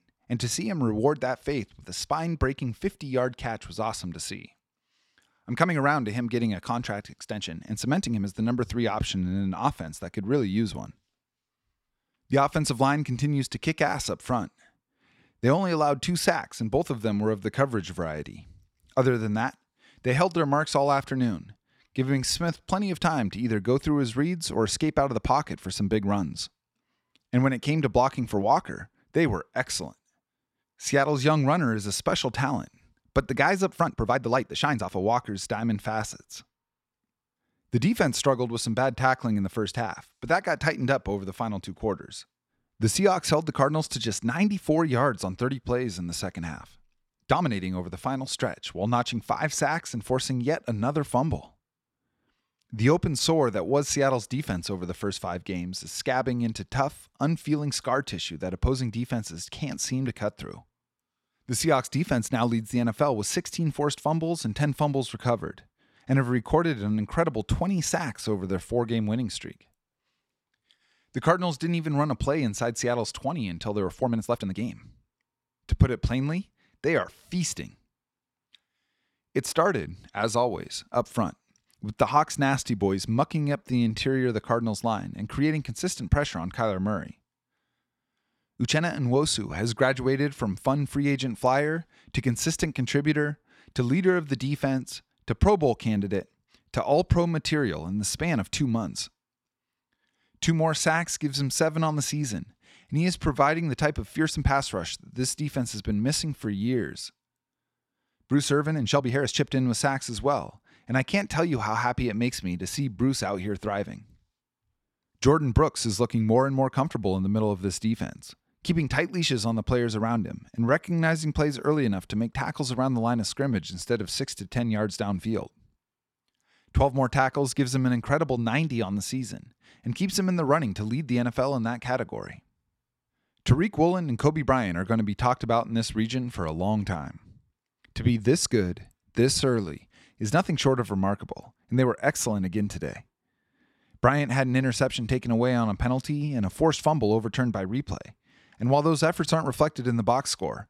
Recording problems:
uneven, jittery; strongly; from 2 s to 2:20

